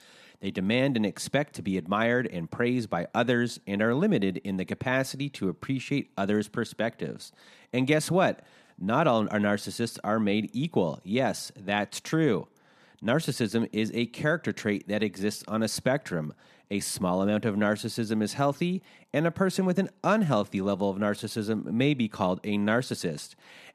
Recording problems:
none

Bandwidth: 13.5 kHz